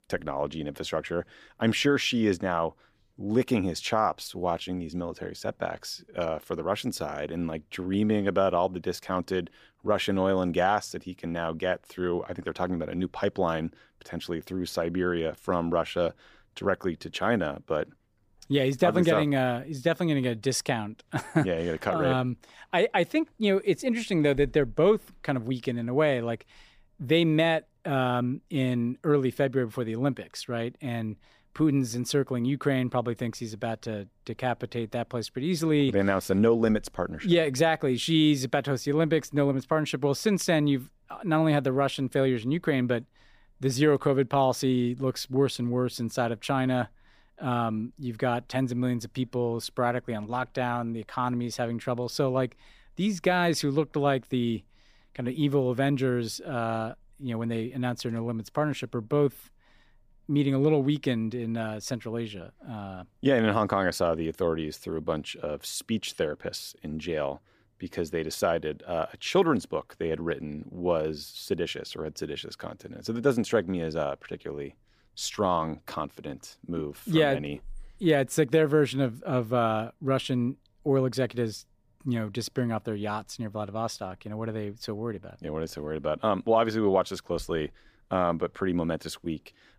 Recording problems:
none

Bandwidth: 15 kHz